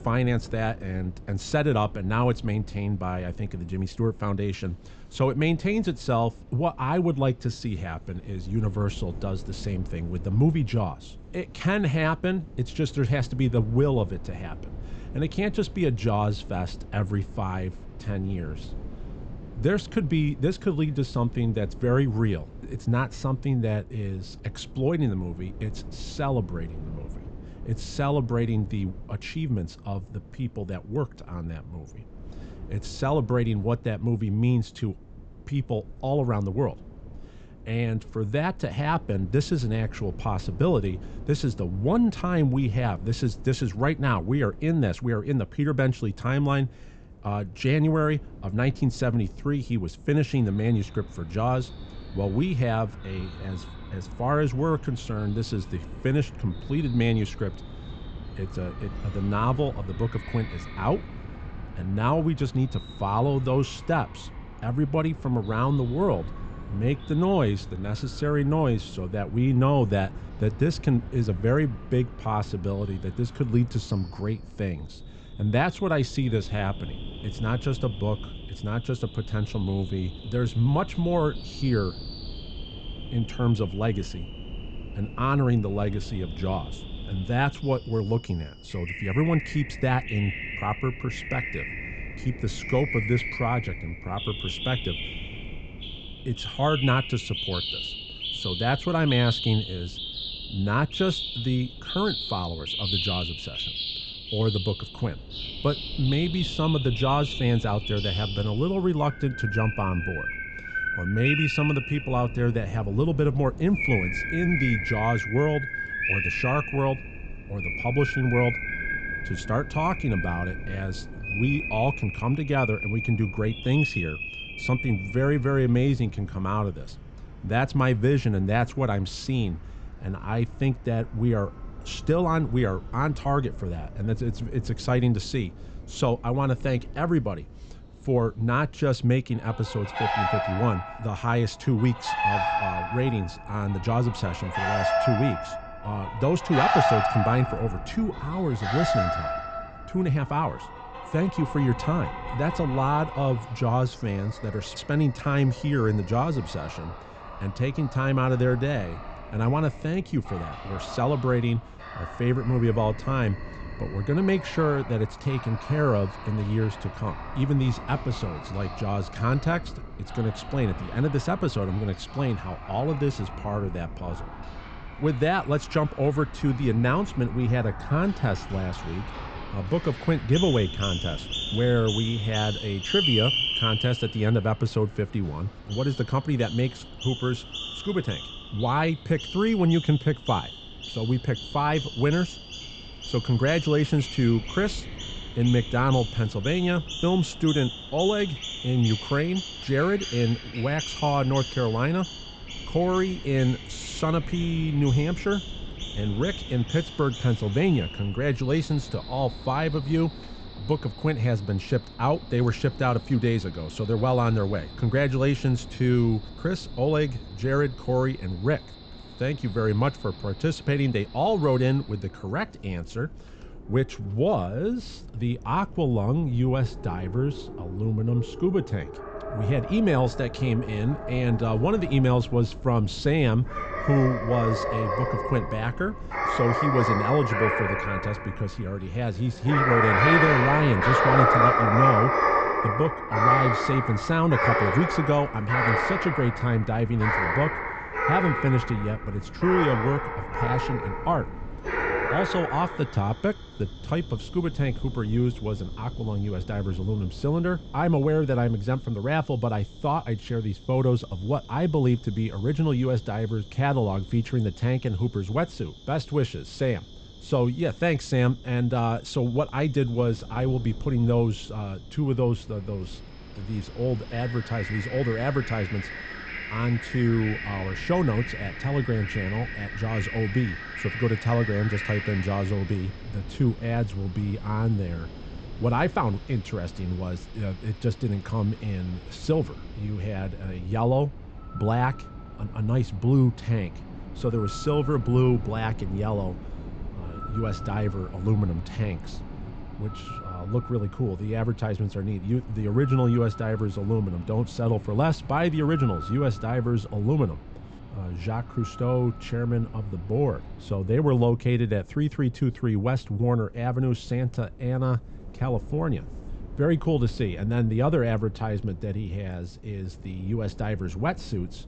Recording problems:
high frequencies cut off; noticeable; nothing above 8 kHz
animal sounds; loud; throughout; 5 dB below the speech
wind noise on the microphone; occasional gusts; 20 dB below the speech

